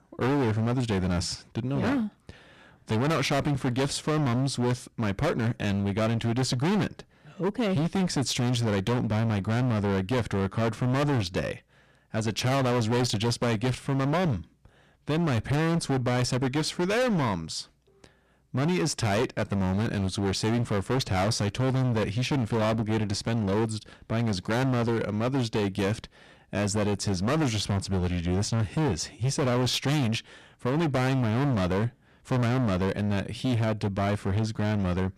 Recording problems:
distortion; heavy; 26% of the sound clipped

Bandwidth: 14 kHz